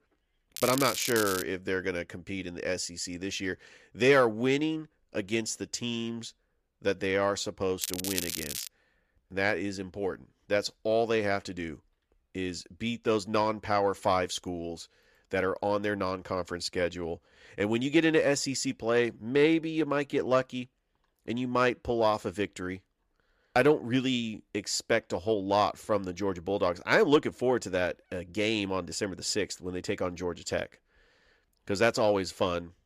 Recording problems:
crackling; loud; at 0.5 s and at 8 s; 5 dB below the speech

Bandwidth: 14.5 kHz